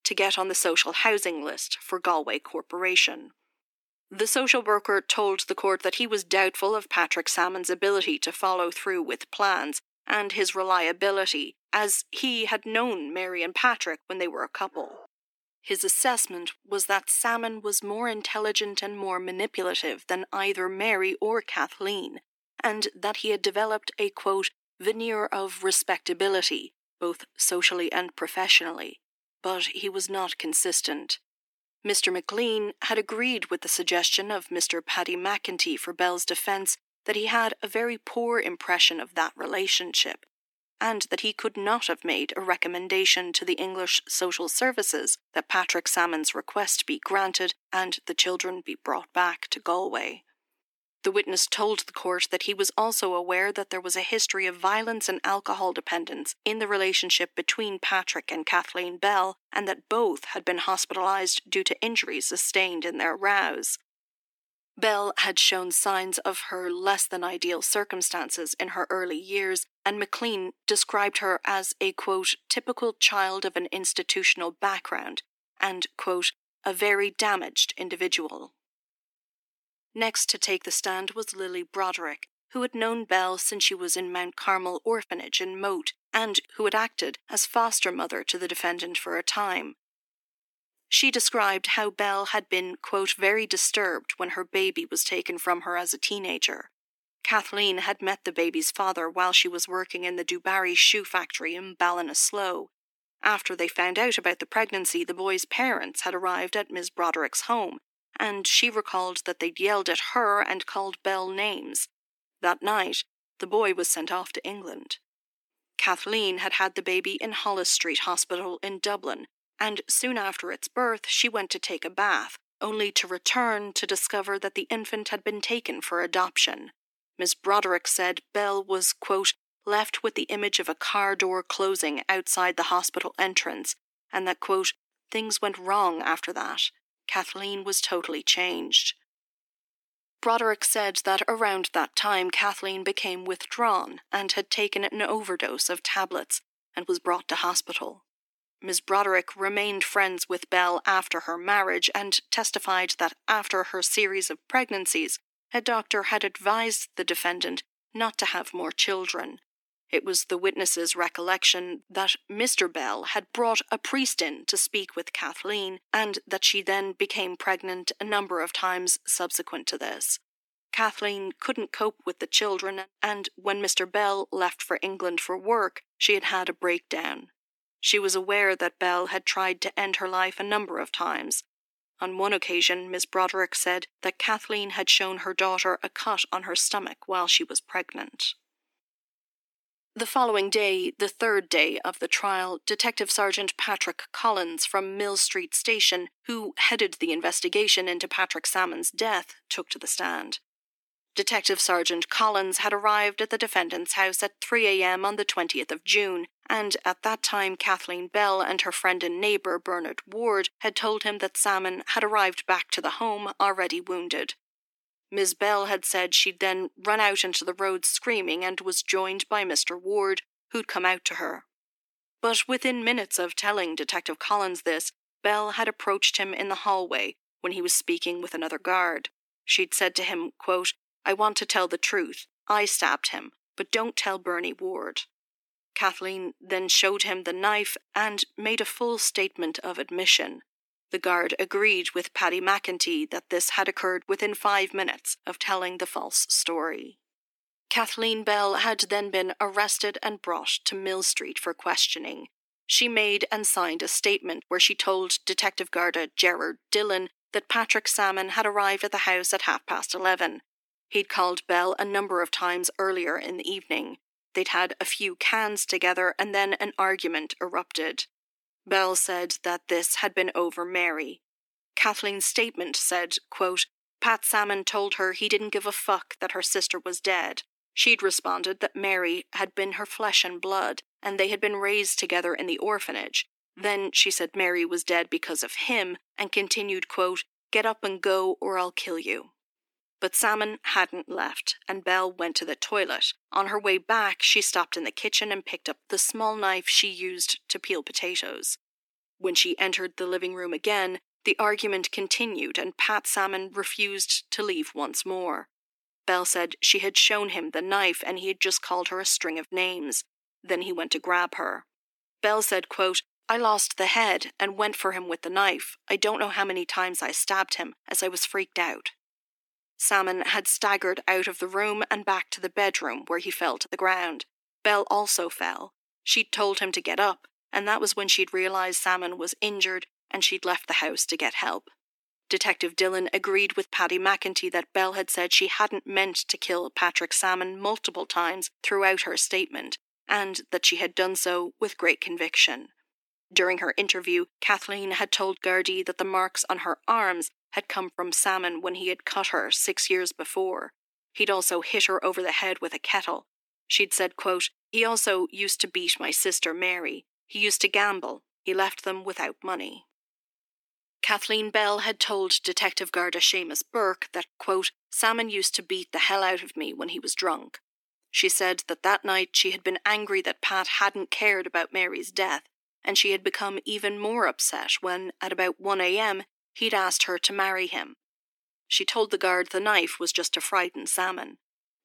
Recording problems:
thin; very; fading below 300 Hz

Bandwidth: 18.5 kHz